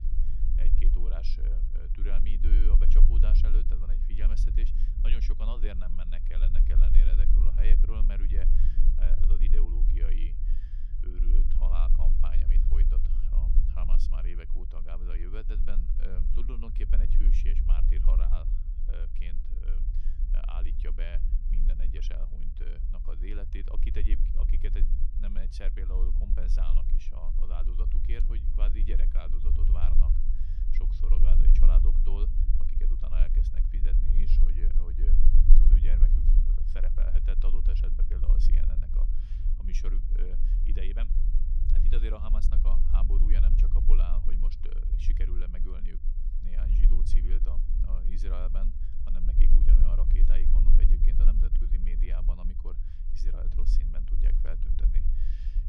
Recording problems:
low rumble; loud; throughout; 3 dB below the speech

